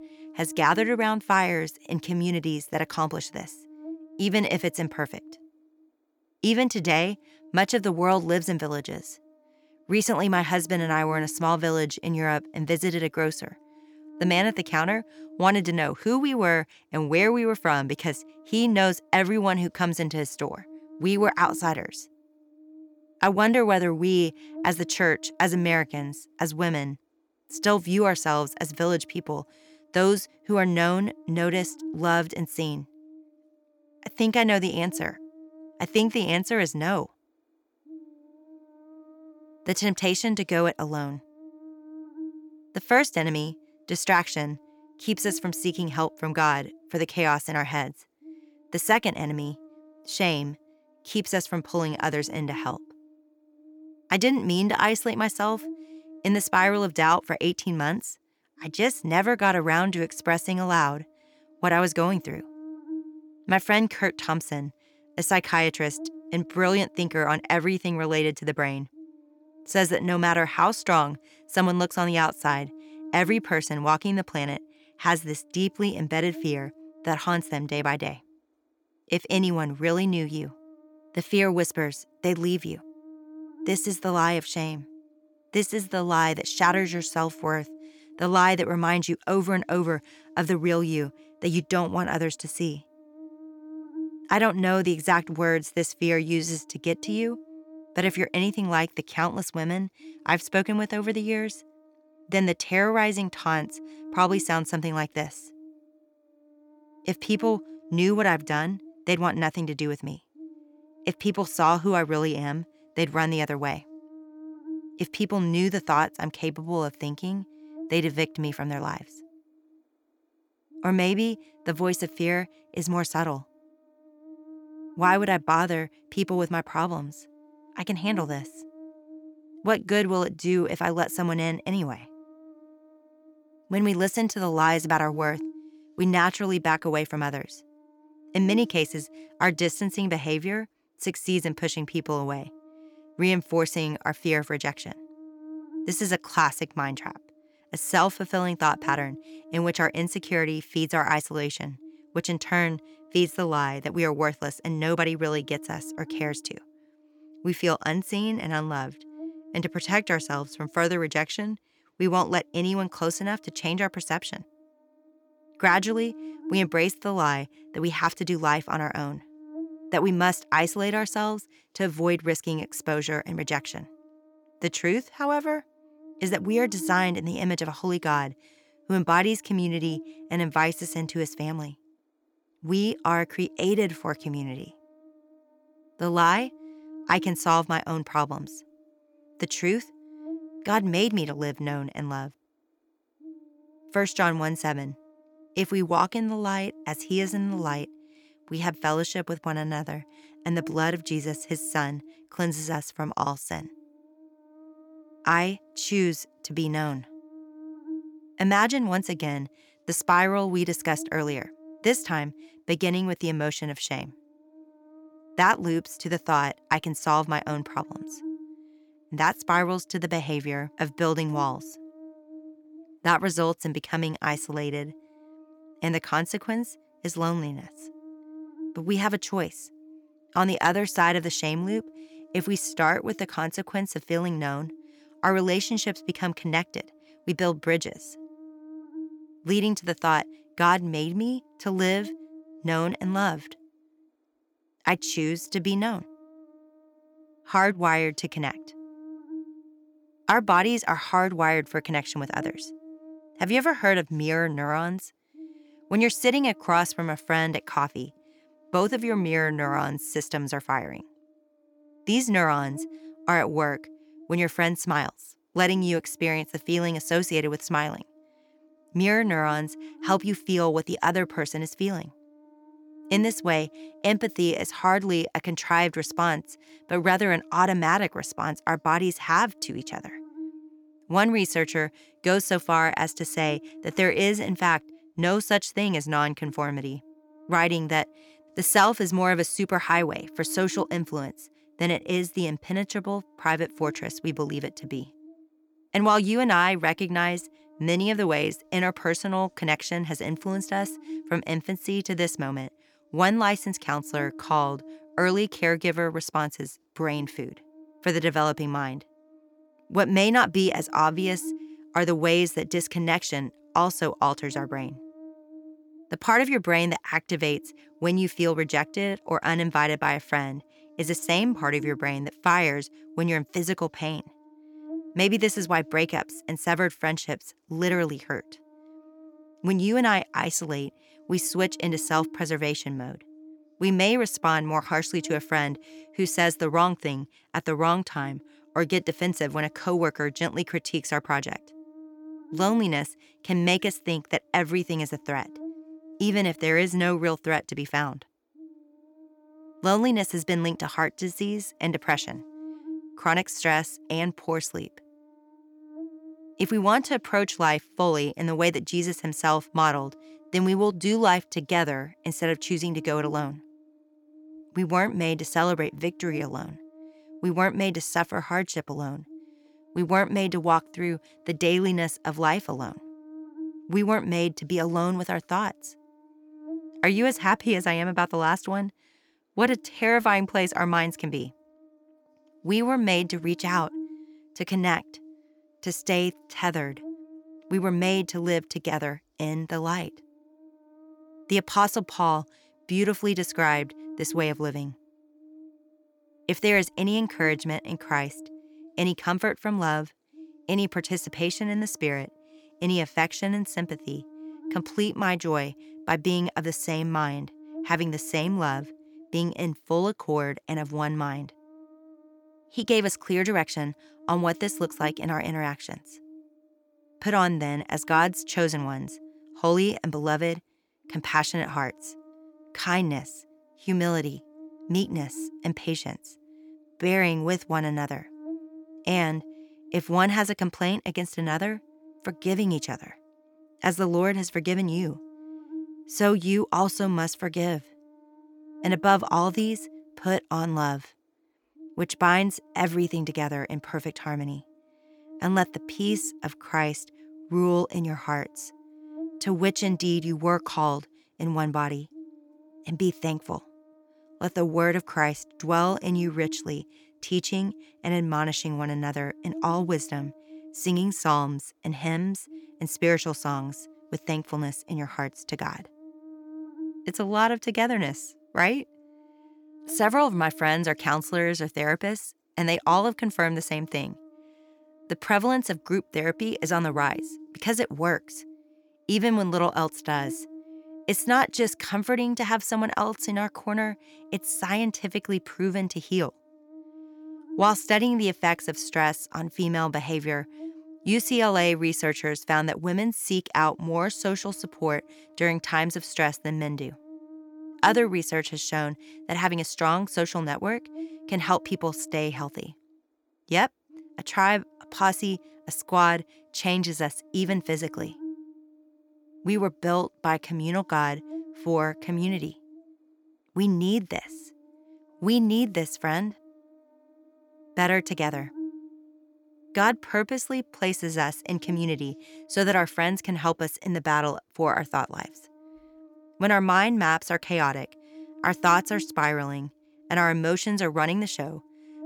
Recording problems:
electrical hum; faint; throughout; 60 Hz, 25 dB below the speech

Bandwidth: 18.5 kHz